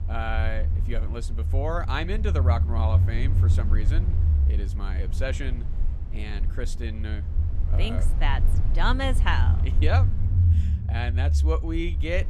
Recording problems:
low rumble; loud; throughout; 9 dB below the speech

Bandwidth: 13.5 kHz